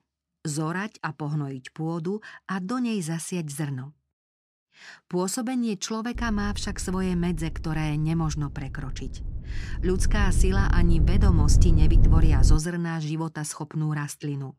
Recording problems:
wind noise on the microphone; heavy; from 6 to 13 s; 6 dB below the speech

